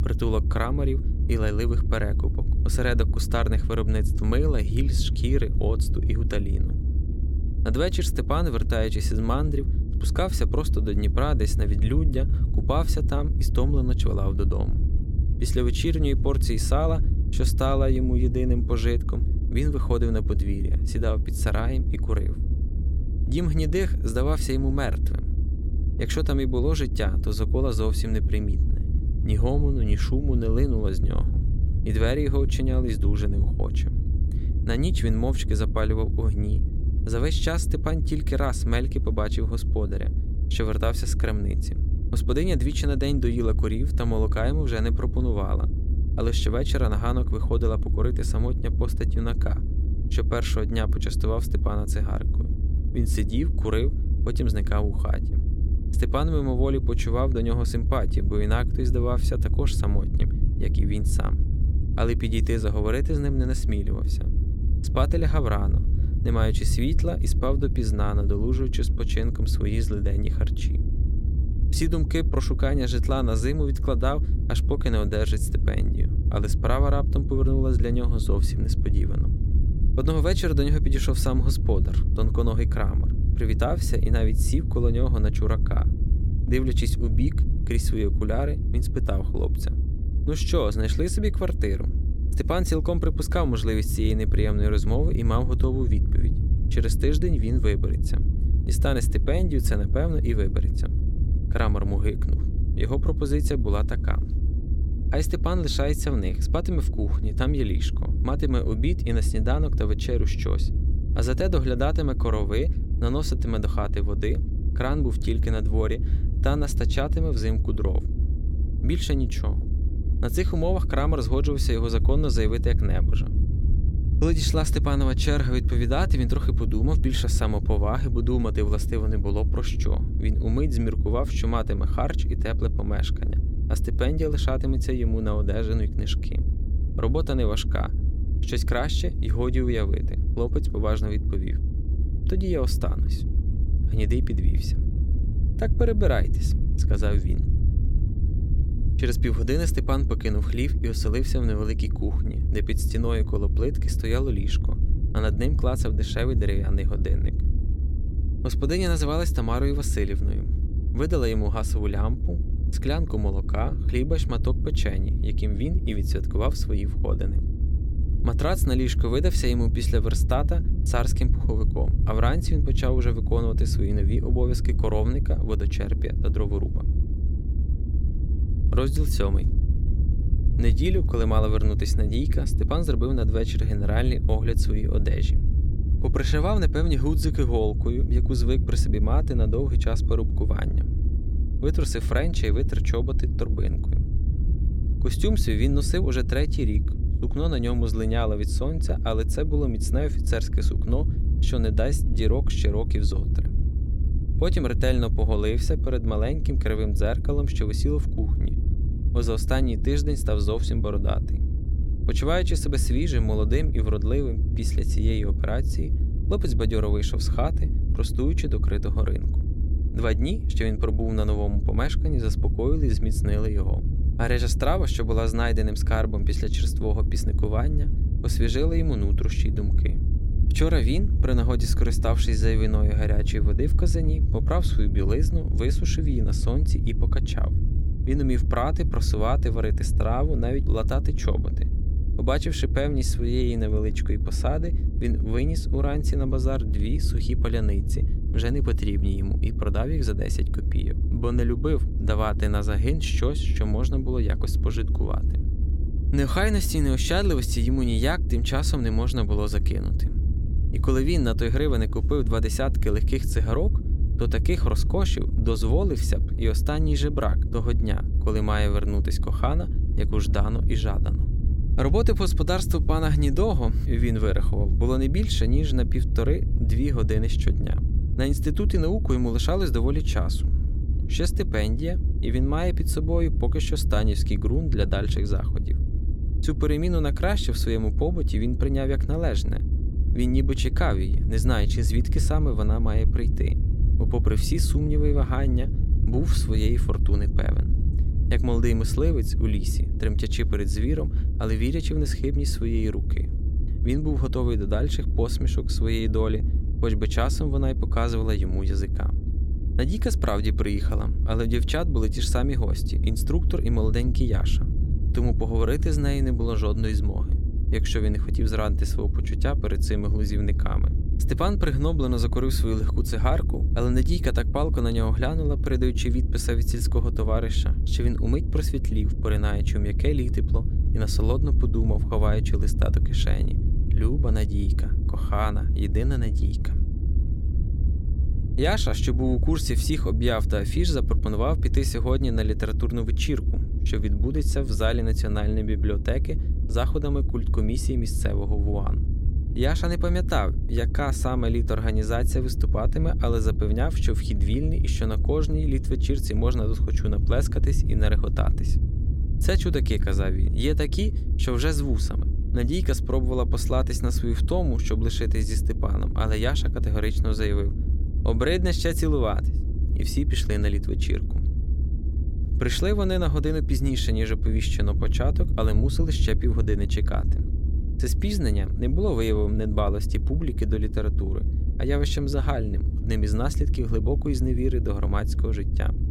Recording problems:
low rumble; noticeable; throughout; 10 dB below the speech

